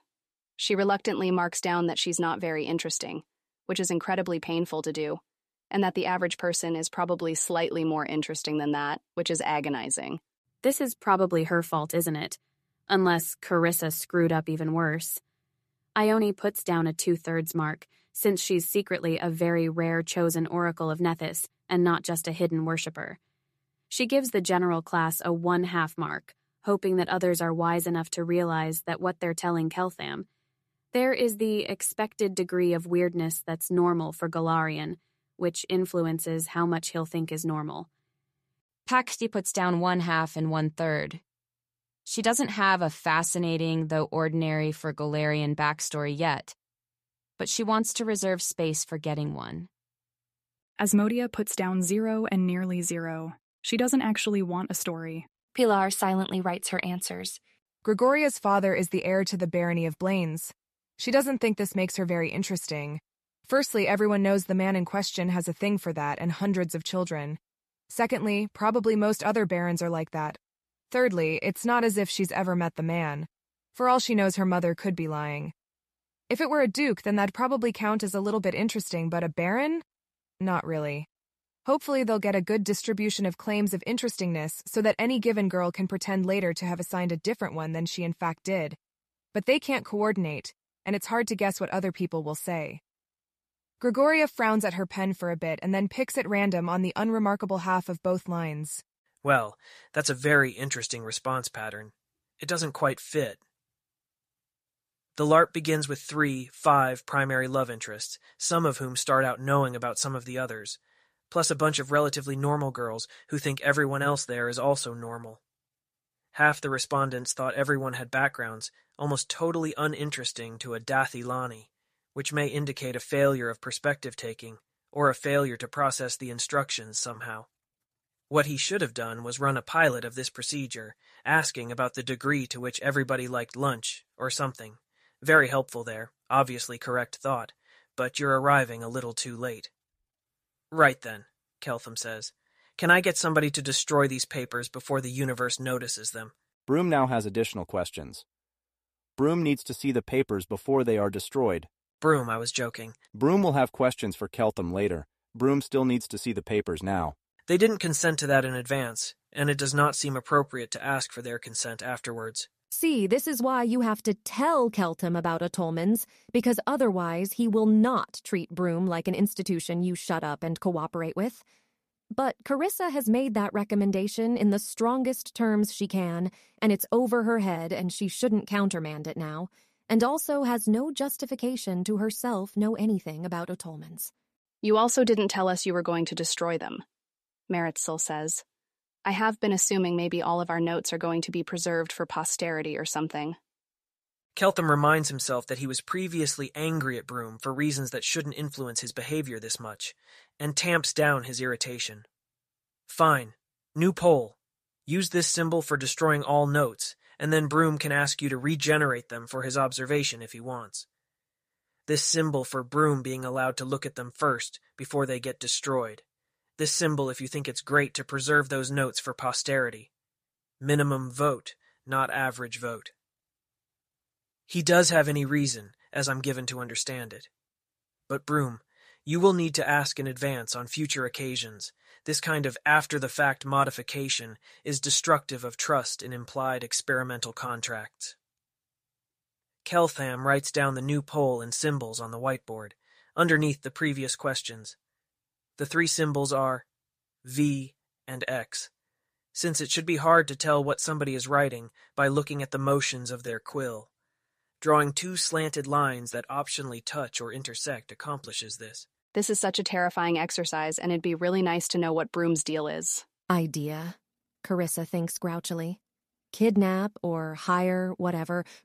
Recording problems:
none

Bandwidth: 14.5 kHz